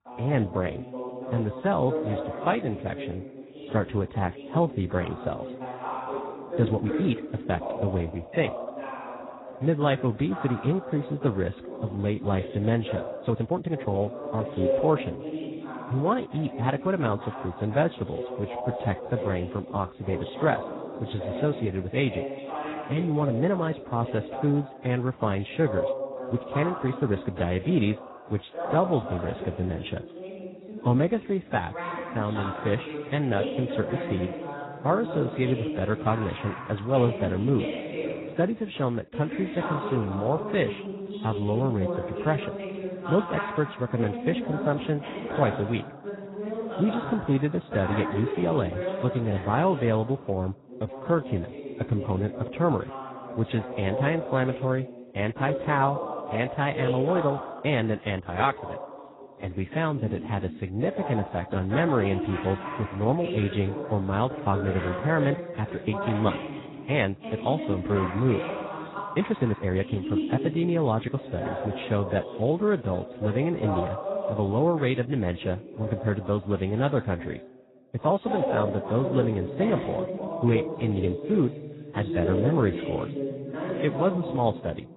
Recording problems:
garbled, watery; badly; nothing above 4 kHz
voice in the background; loud; throughout; 6 dB below the speech
uneven, jittery; strongly; from 6.5 s to 1:10

